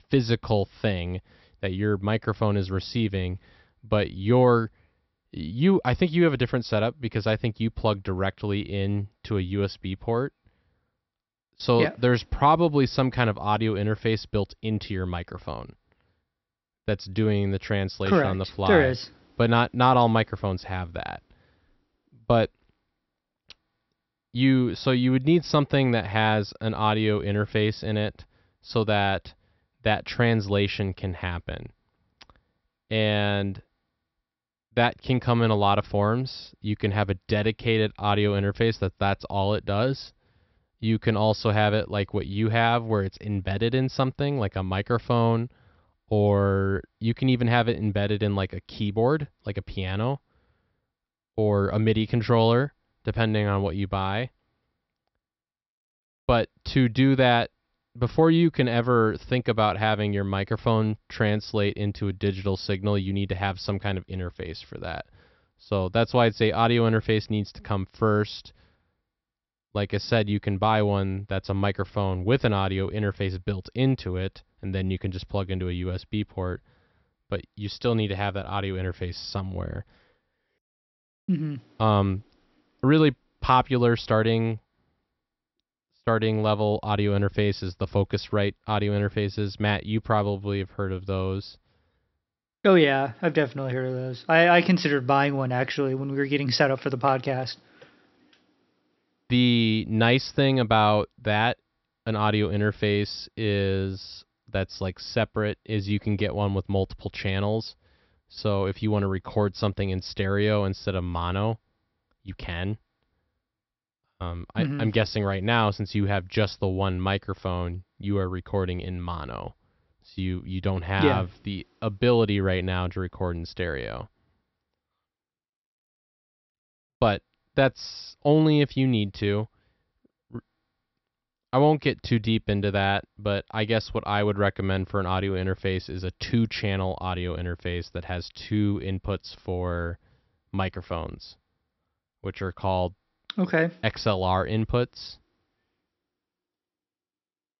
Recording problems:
high frequencies cut off; noticeable; nothing above 5.5 kHz

